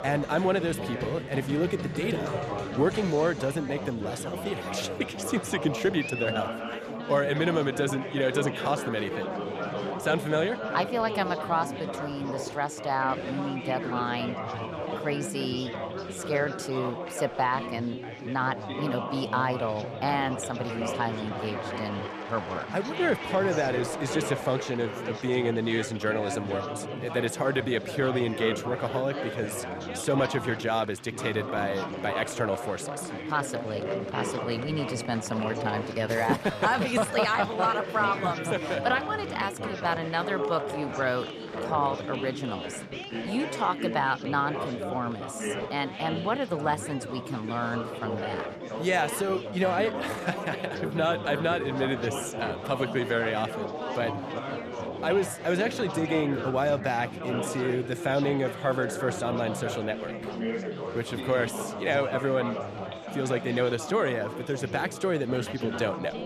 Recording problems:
chatter from many people; loud; throughout; 5 dB below the speech

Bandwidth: 14 kHz